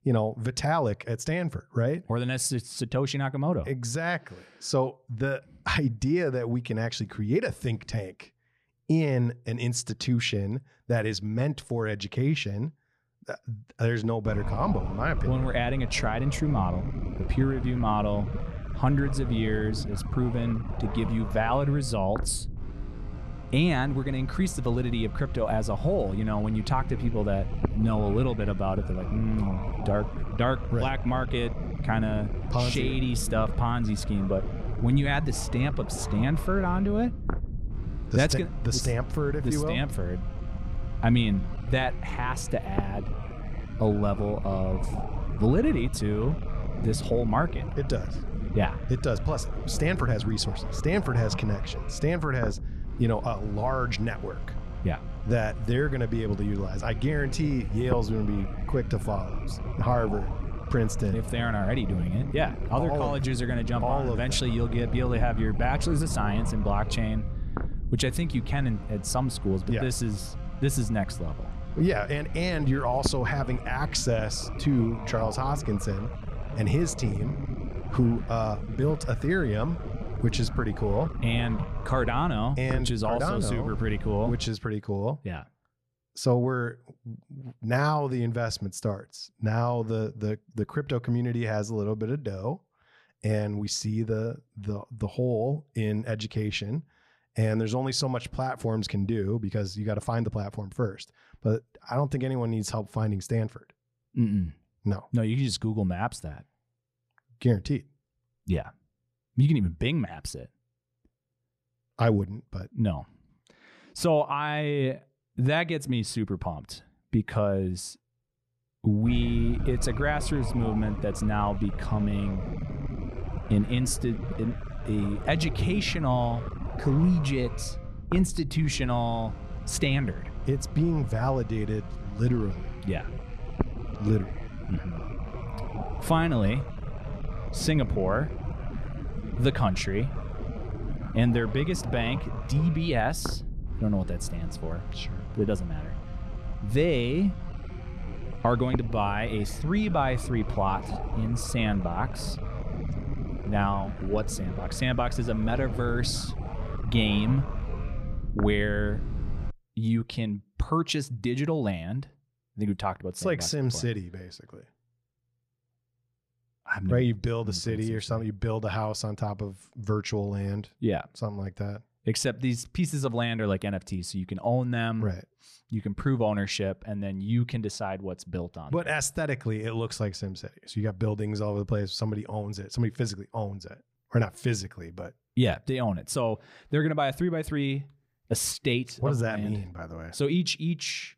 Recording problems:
low rumble; noticeable; from 14 s to 1:24 and from 1:59 to 2:40; 10 dB below the speech

